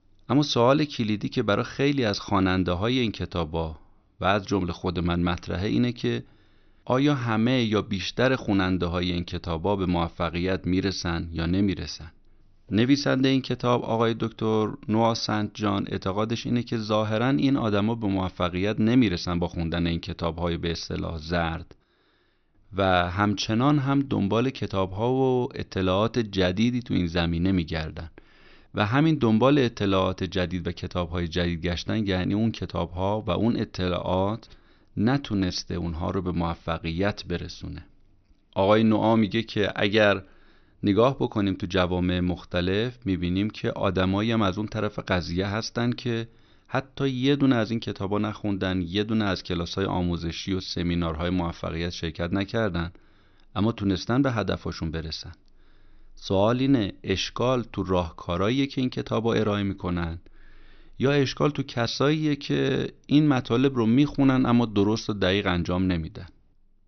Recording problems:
high frequencies cut off; noticeable; nothing above 6 kHz

